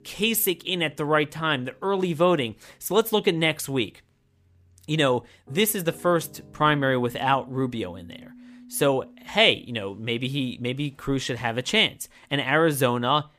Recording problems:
background music; faint; throughout; 25 dB below the speech

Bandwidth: 15 kHz